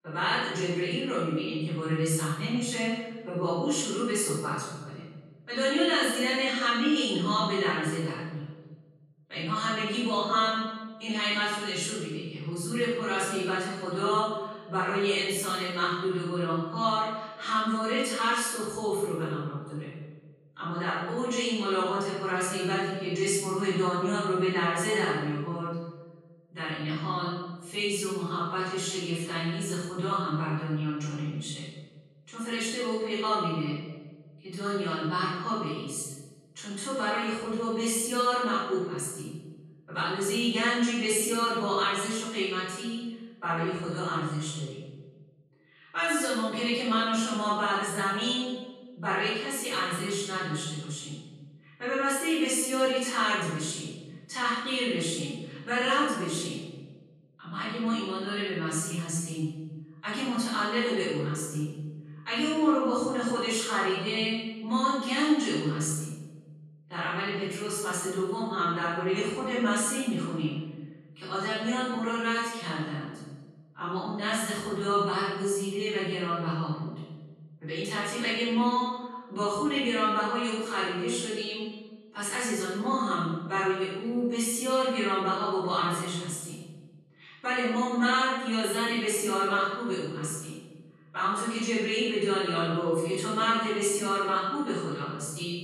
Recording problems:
room echo; strong; dies away in 1.2 s
off-mic speech; far

